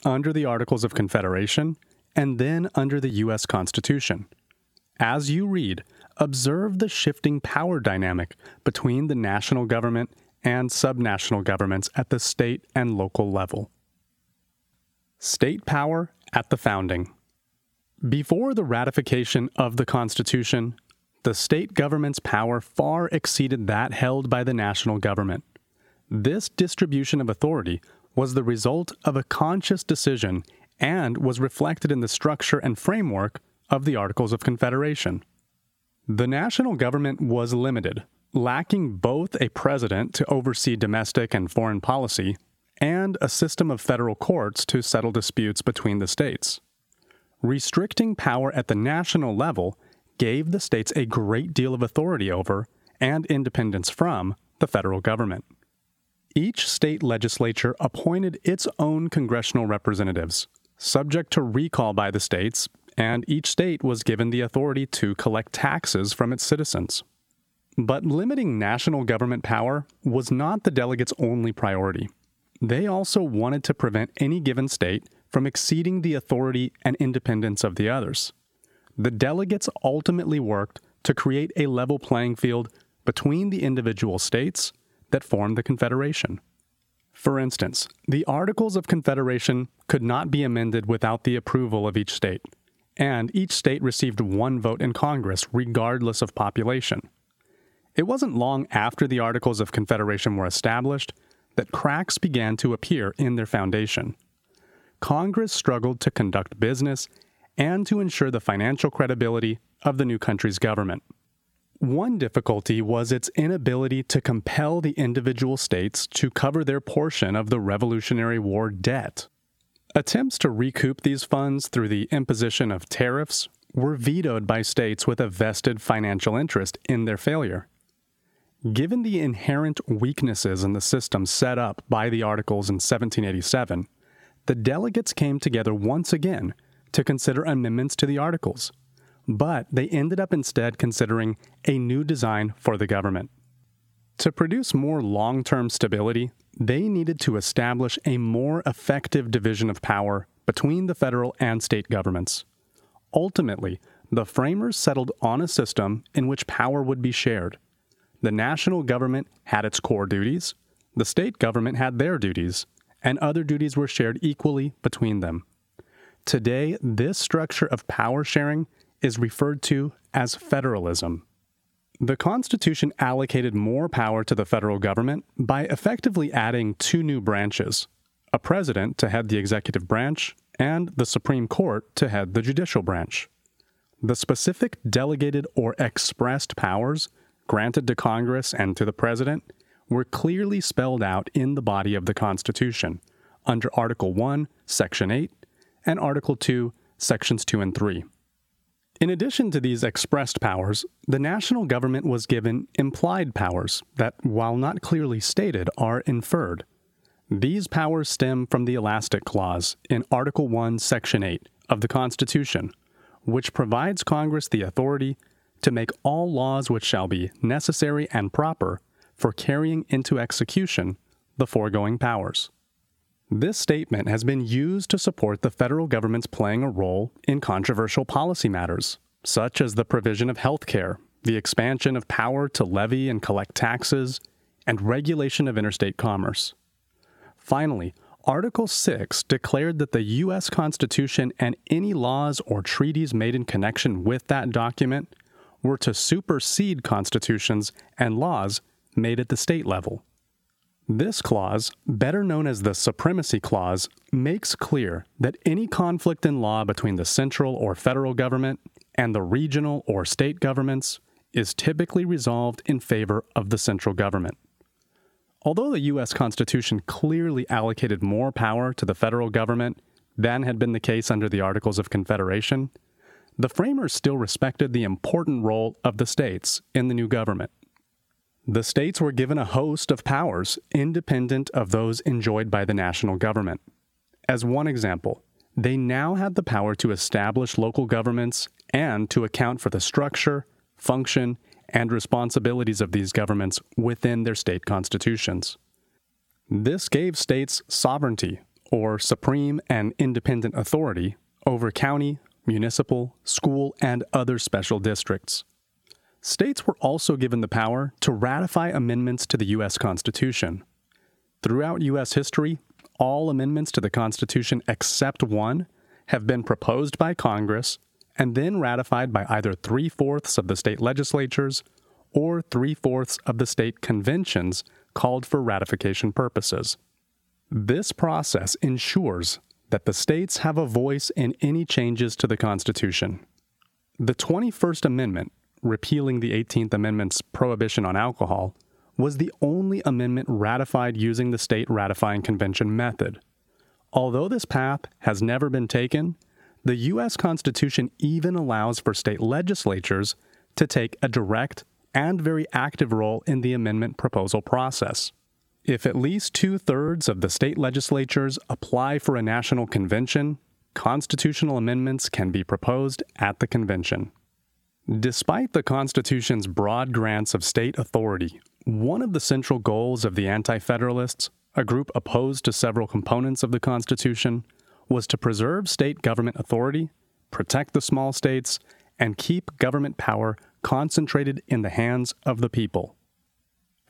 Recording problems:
squashed, flat; somewhat

